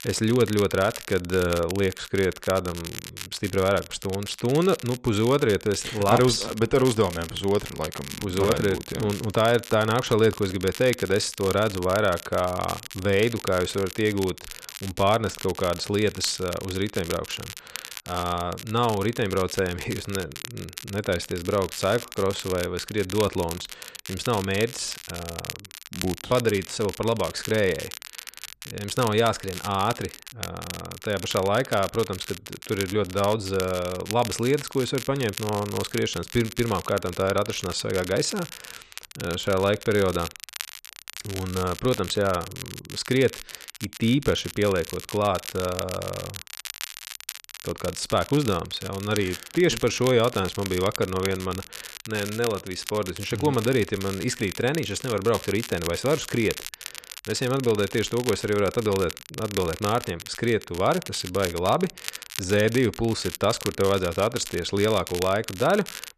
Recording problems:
crackle, like an old record; noticeable; 10 dB below the speech

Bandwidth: 13.5 kHz